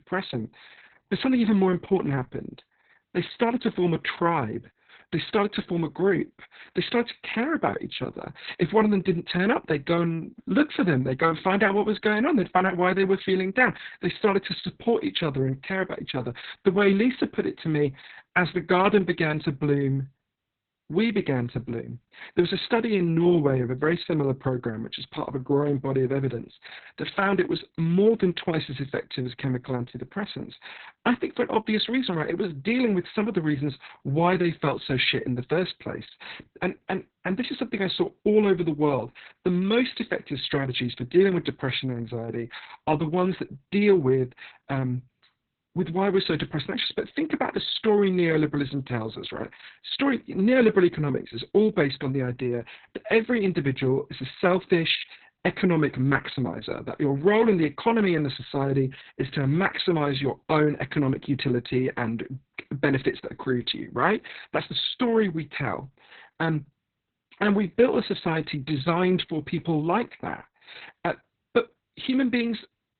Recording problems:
garbled, watery; badly; nothing above 4 kHz

